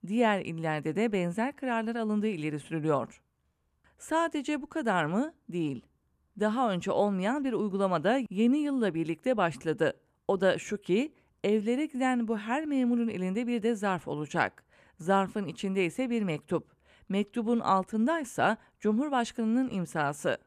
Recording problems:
none

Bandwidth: 14.5 kHz